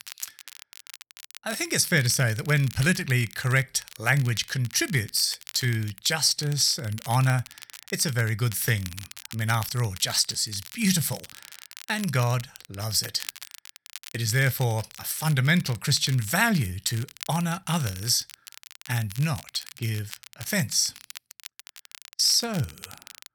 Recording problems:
crackle, like an old record; noticeable; 15 dB below the speech

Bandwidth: 18.5 kHz